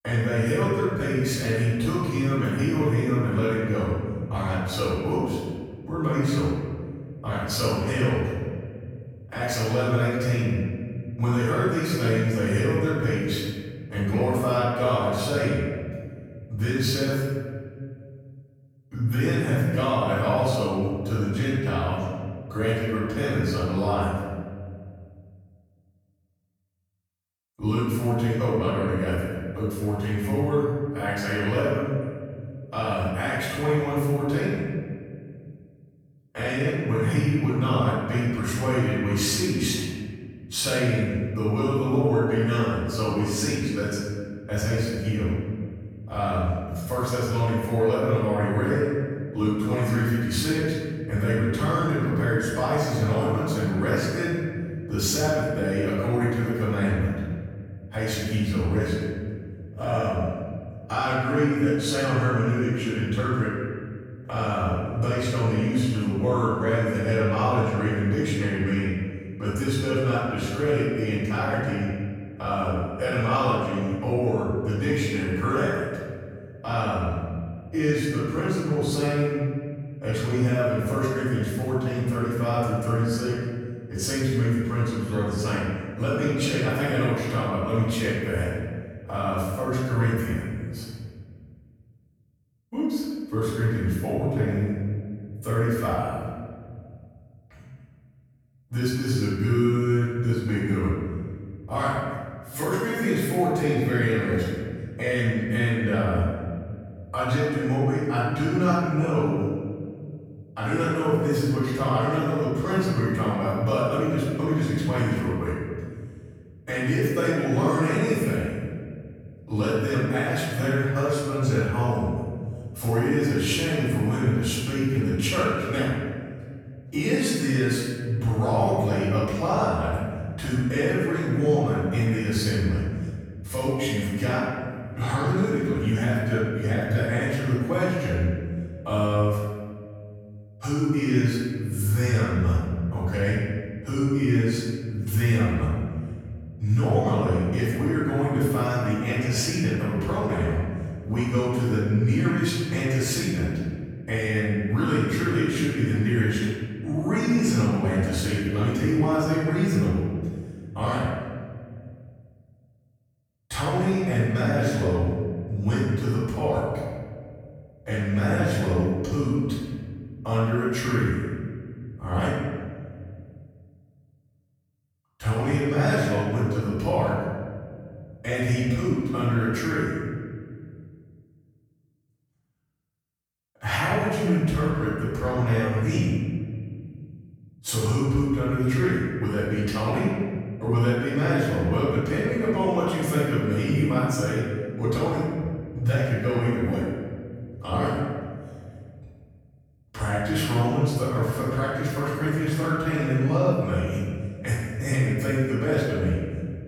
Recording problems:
room echo; strong; dies away in 2 s
off-mic speech; far

